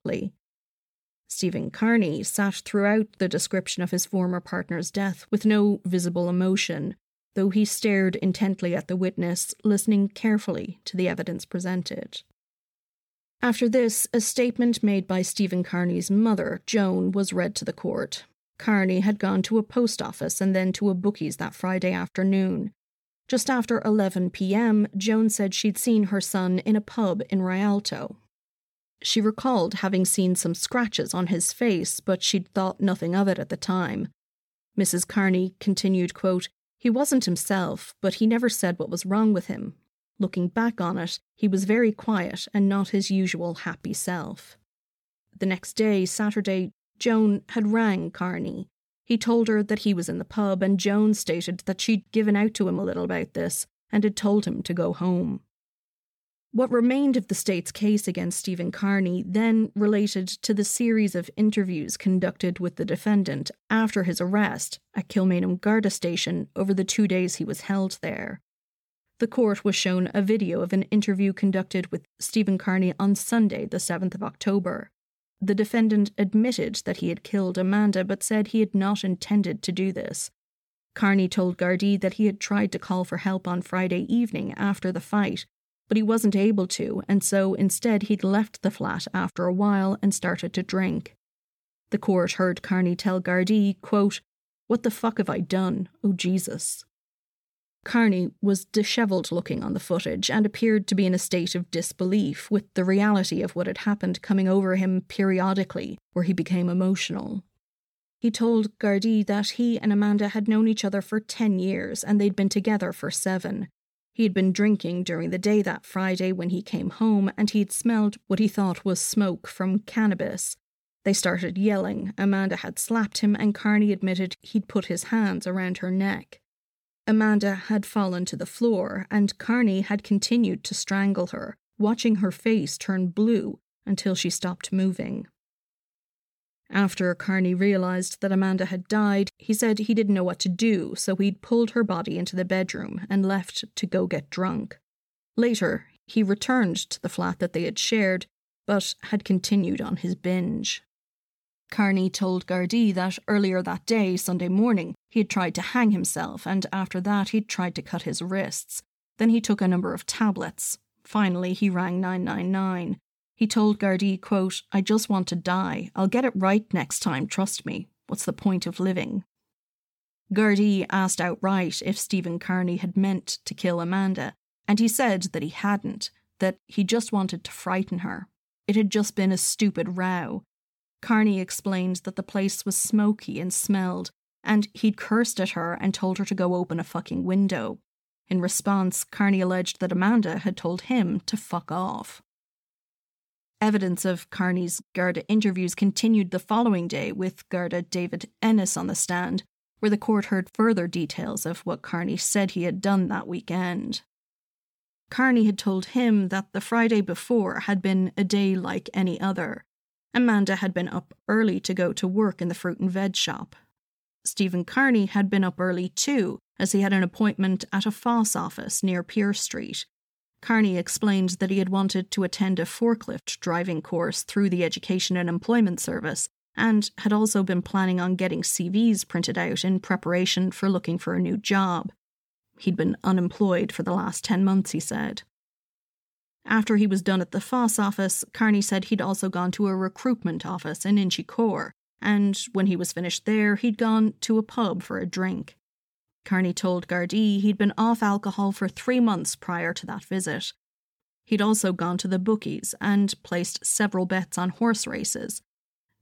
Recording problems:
none

